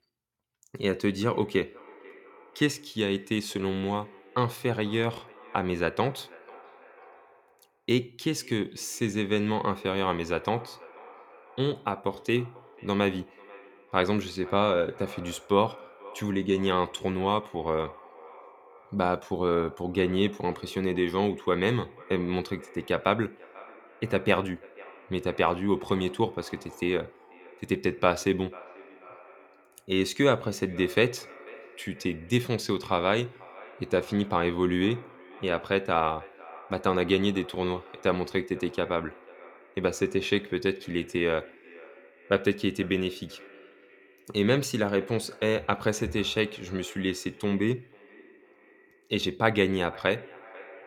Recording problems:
echo of what is said; faint; throughout; 490 ms later, 20 dB below the speech

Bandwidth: 17 kHz